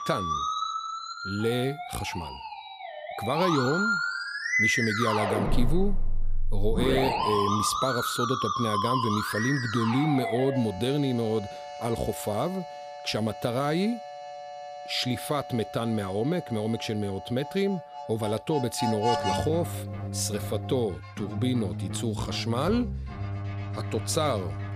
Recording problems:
background music; loud; throughout; 3 dB below the speech

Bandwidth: 15 kHz